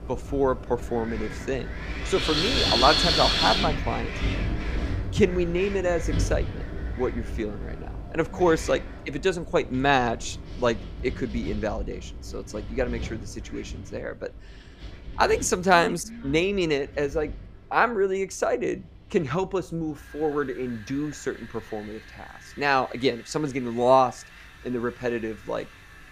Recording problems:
wind in the background; loud; throughout; 3 dB below the speech

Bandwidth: 14.5 kHz